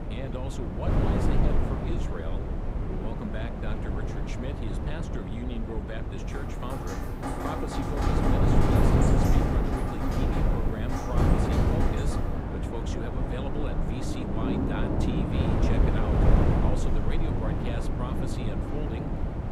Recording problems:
rain or running water; very loud; from 6.5 s on; 4 dB above the speech
wind noise on the microphone; heavy; 5 dB above the speech

